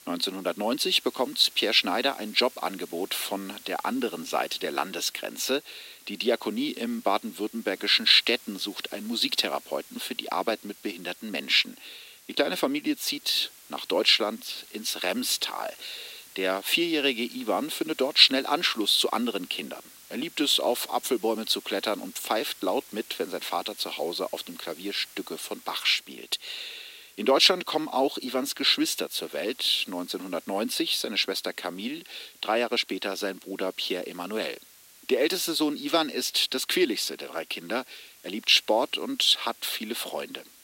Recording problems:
thin; somewhat; fading below 300 Hz
hiss; faint; throughout; 20 dB below the speech

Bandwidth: 16 kHz